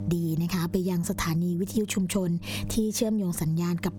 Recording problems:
squashed, flat; heavily
electrical hum; faint; throughout; 50 Hz, 20 dB below the speech

